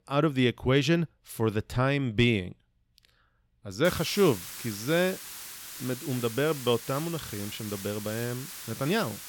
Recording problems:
hiss; noticeable; from 4 s on; 10 dB below the speech

